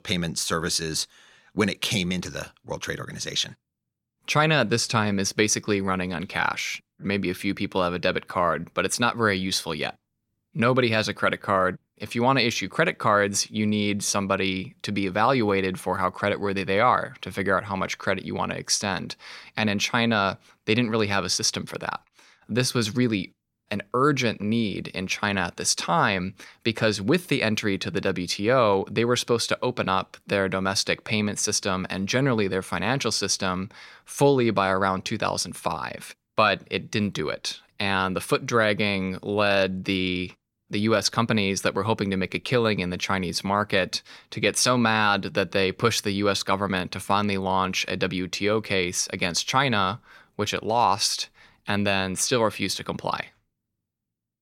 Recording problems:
none

